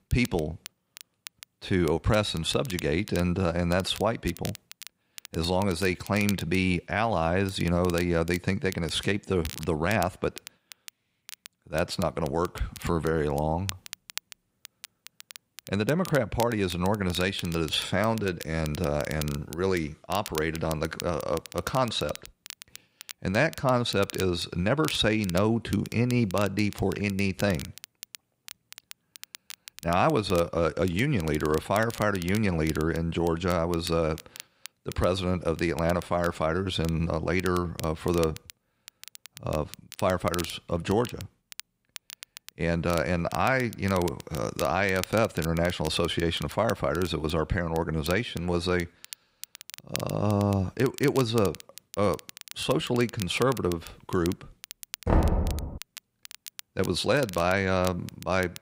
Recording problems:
crackle, like an old record; noticeable; 15 dB below the speech
door banging; loud; at 55 s; peak 3 dB above the speech

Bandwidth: 15.5 kHz